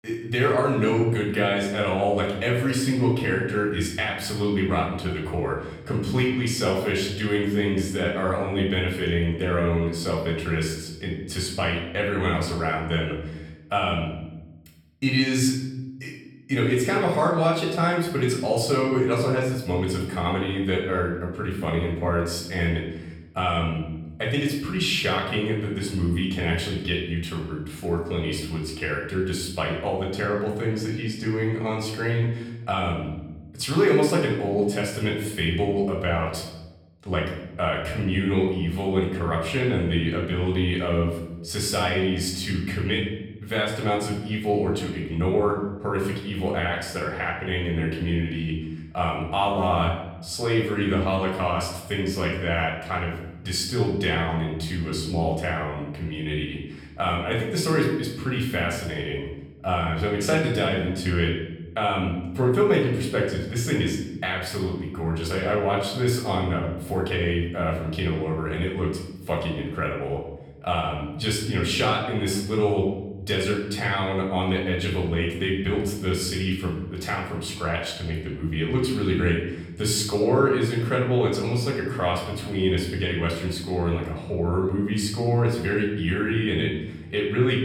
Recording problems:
off-mic speech; far
room echo; noticeable; dies away in 0.8 s

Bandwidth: 18 kHz